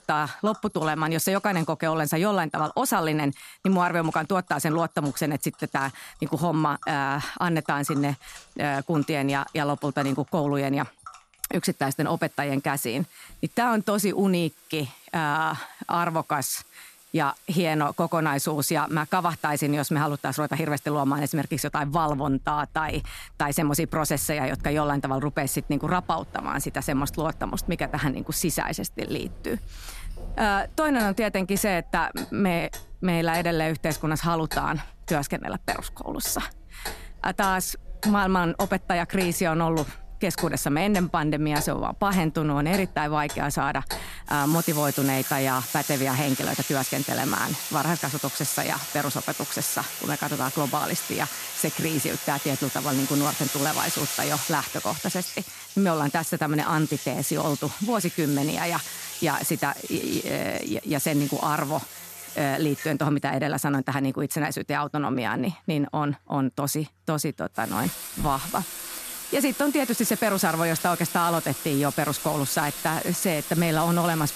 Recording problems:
household noises; loud; throughout; 8 dB below the speech

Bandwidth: 14 kHz